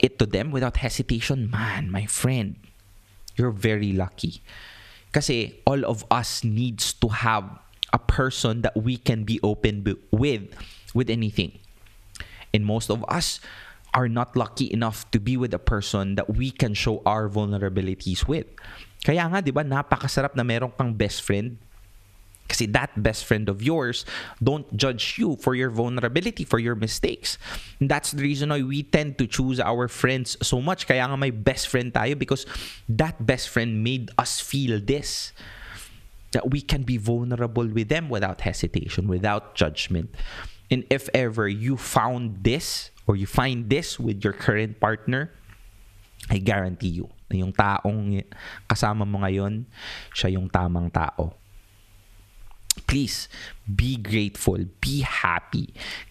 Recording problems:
squashed, flat; somewhat

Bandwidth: 14.5 kHz